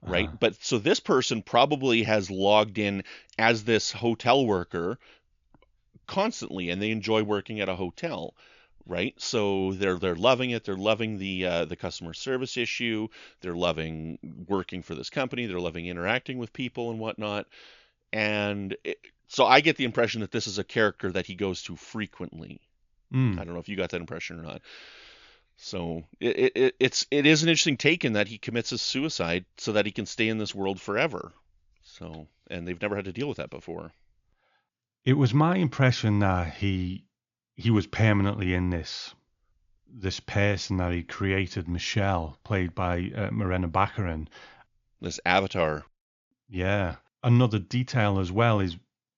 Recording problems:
high frequencies cut off; noticeable; nothing above 7 kHz

